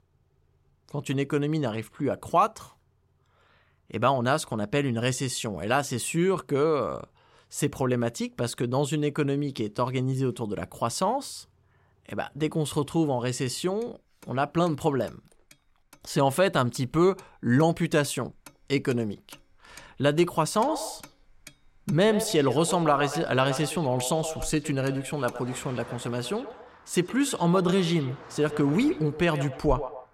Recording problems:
echo of what is said; strong; from 21 s on; 120 ms later, 10 dB below the speech
traffic noise; faint; throughout; 25 dB below the speech

